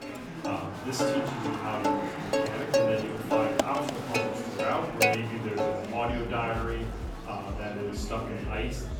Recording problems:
off-mic speech; far
room echo; slight; dies away in 0.7 s
background music; very loud; throughout; 3 dB above the speech
murmuring crowd; loud; throughout; 4 dB below the speech

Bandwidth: 18.5 kHz